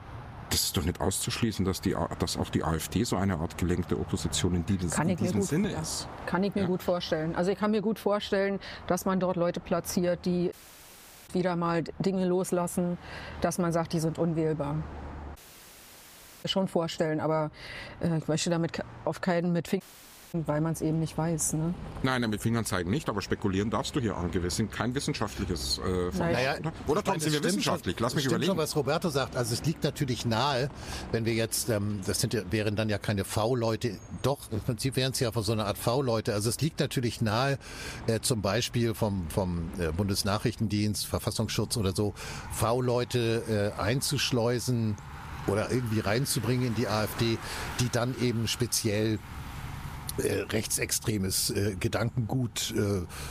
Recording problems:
squashed, flat; somewhat, background pumping
traffic noise; noticeable; throughout; 15 dB below the speech
audio cutting out; at 11 s for 1 s, at 15 s for 1 s and at 20 s for 0.5 s

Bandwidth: 15 kHz